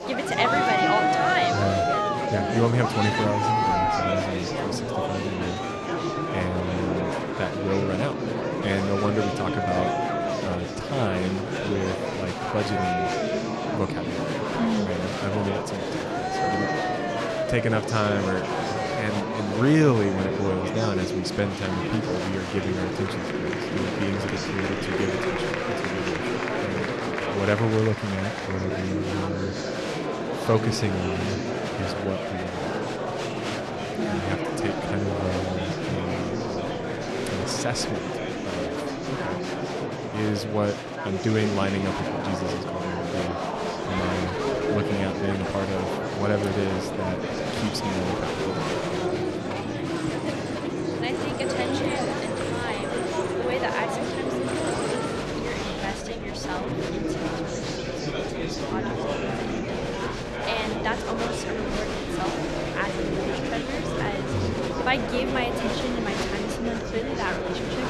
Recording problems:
murmuring crowd; very loud; throughout; 2 dB above the speech

